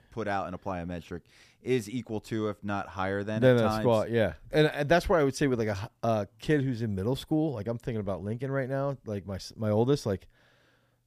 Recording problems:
none

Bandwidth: 15 kHz